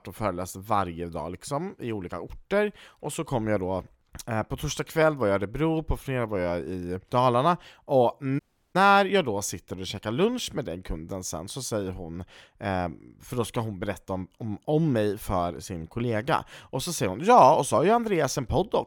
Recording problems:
audio cutting out; at 8.5 s

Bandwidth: 17.5 kHz